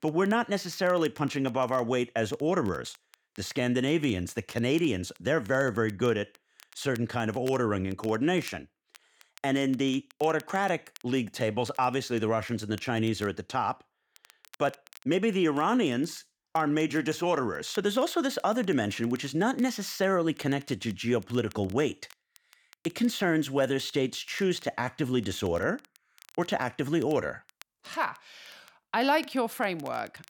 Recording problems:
crackle, like an old record; faint; 25 dB below the speech

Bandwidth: 18 kHz